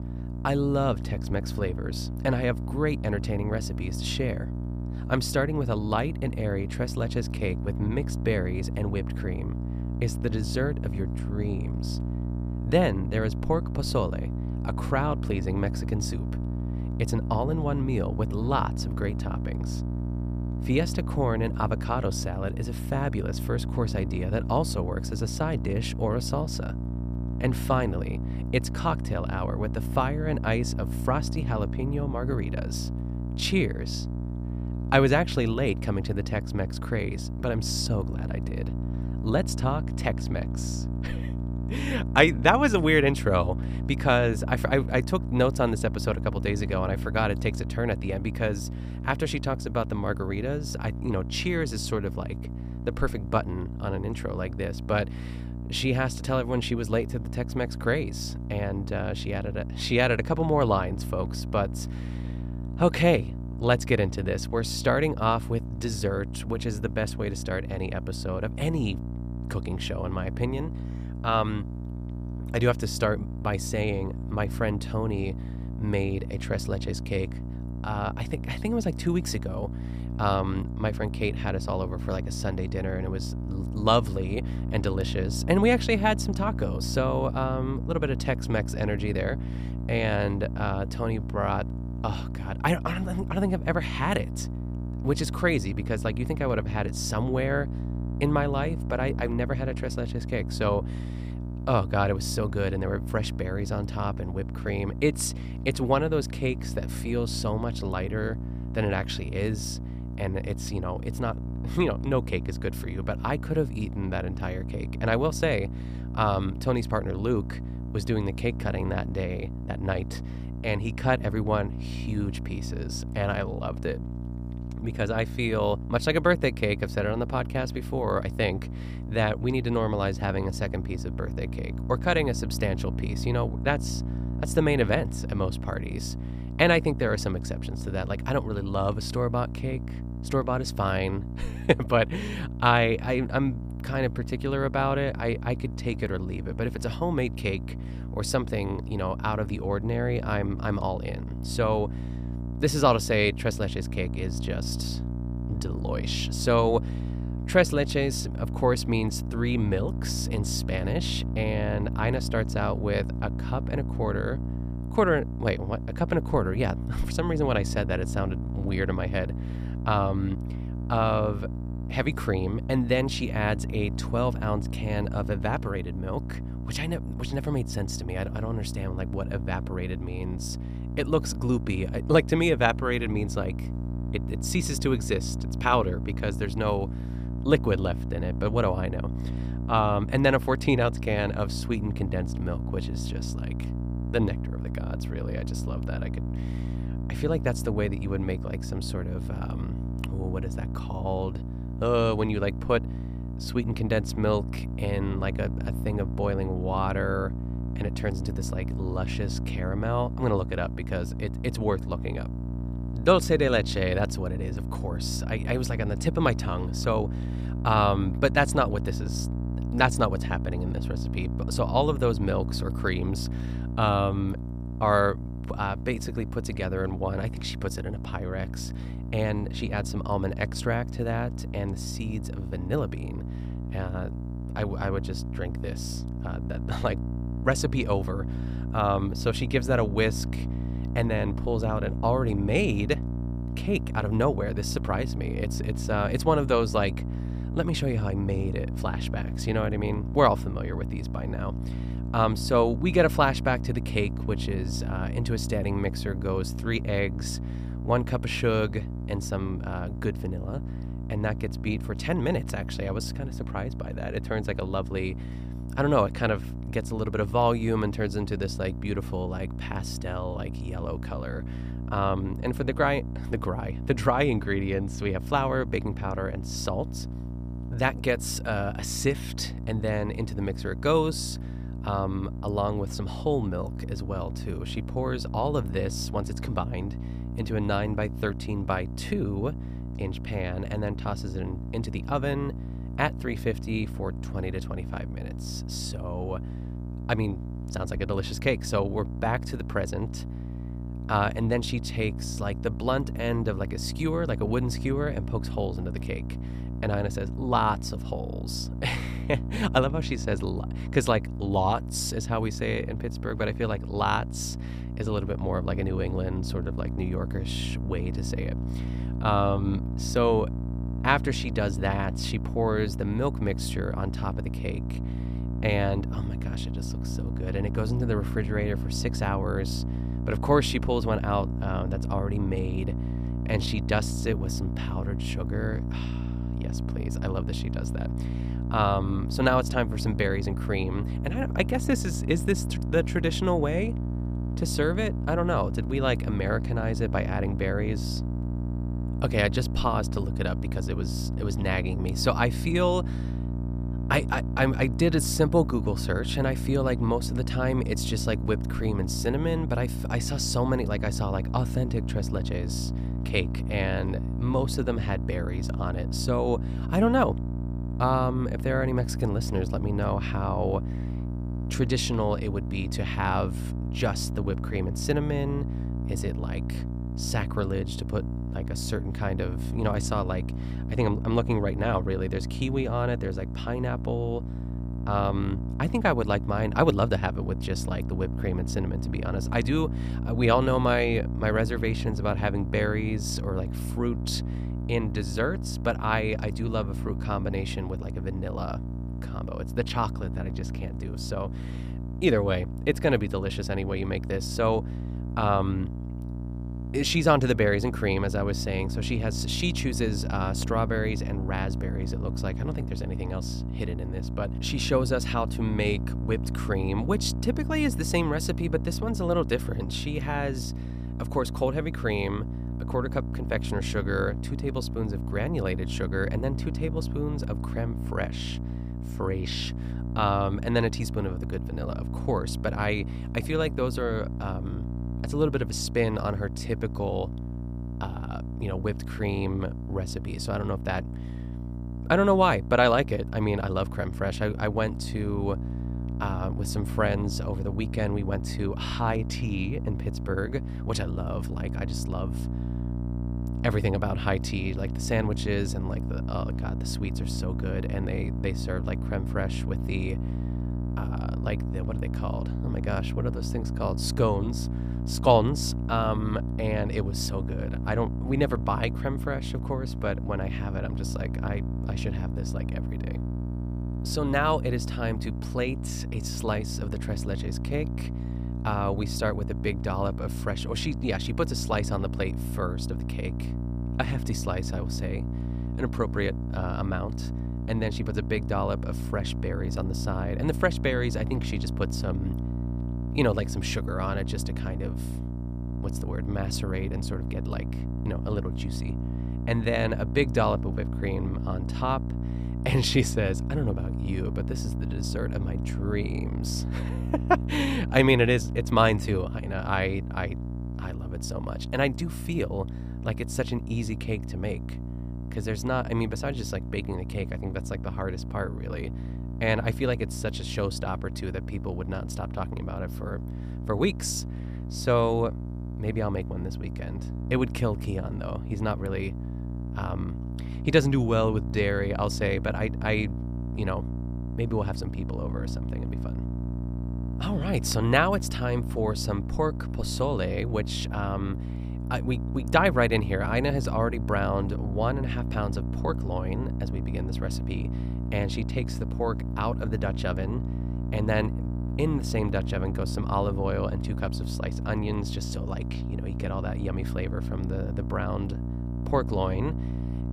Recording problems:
electrical hum; noticeable; throughout; 60 Hz, 15 dB below the speech

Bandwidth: 15 kHz